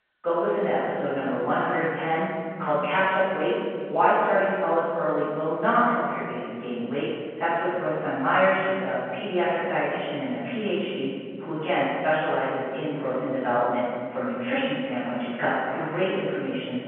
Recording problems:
room echo; strong; dies away in 2.5 s
off-mic speech; far
phone-call audio

